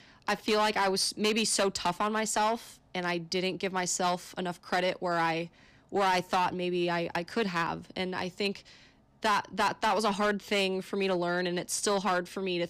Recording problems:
distortion; slight; 6% of the sound clipped

